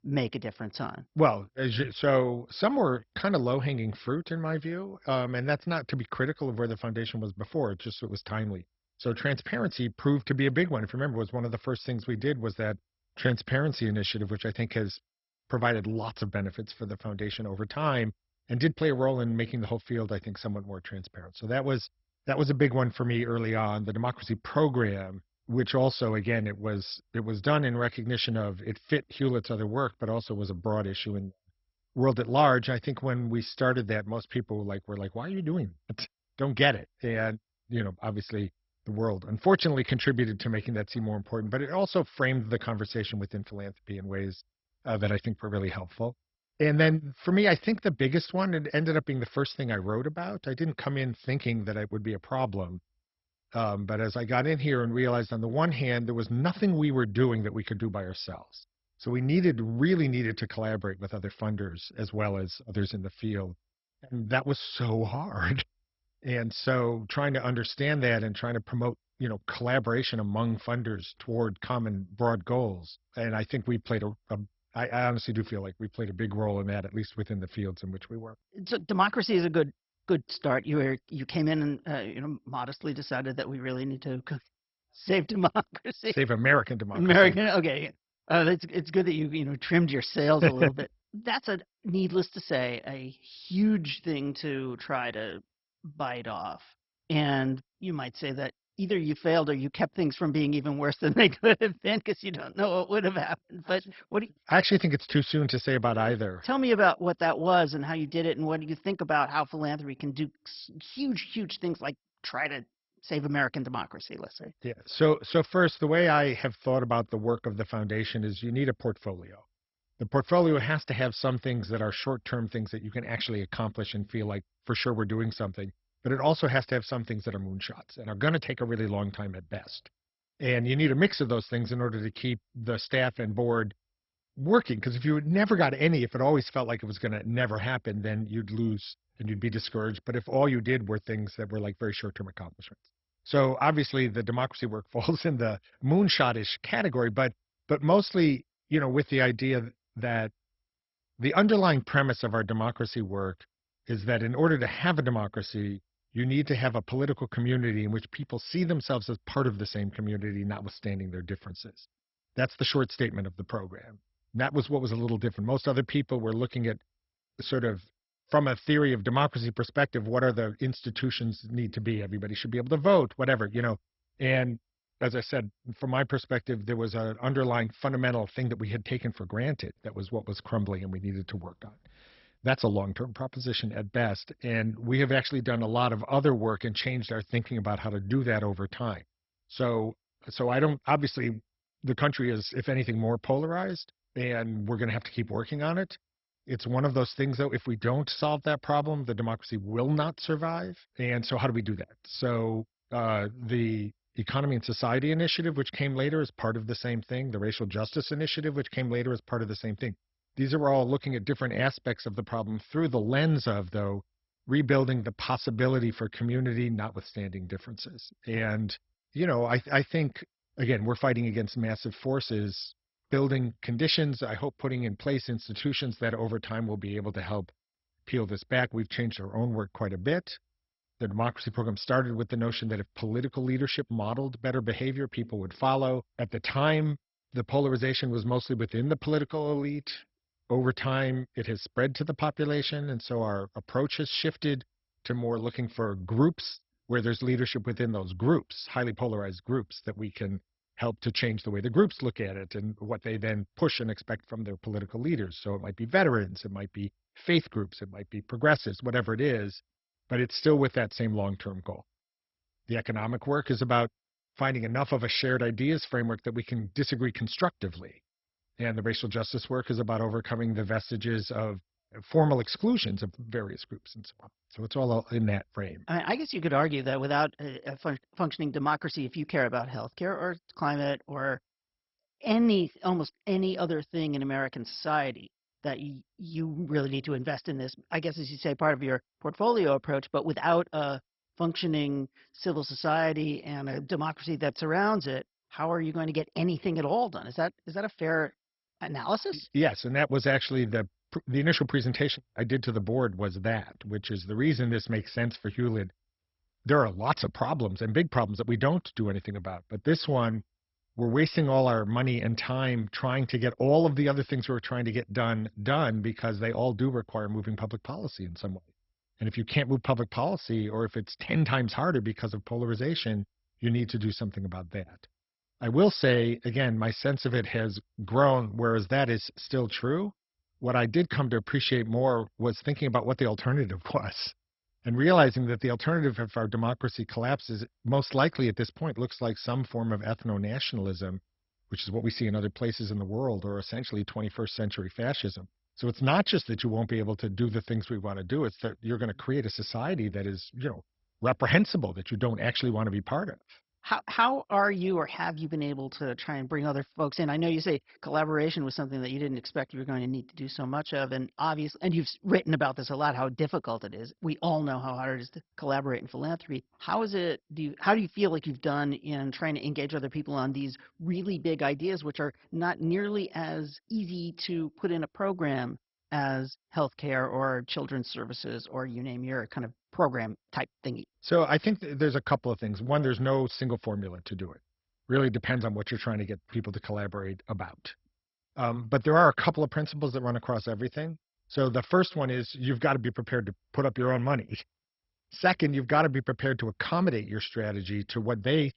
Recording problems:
garbled, watery; badly; nothing above 5.5 kHz

